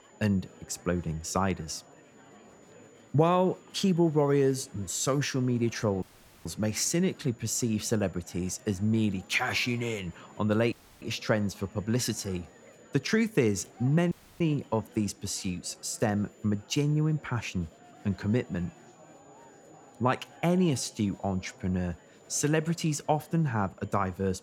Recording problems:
high-pitched whine; faint; throughout; 7 kHz, 35 dB below the speech
murmuring crowd; faint; throughout; 25 dB below the speech
audio cutting out; at 6 s, at 11 s and at 14 s

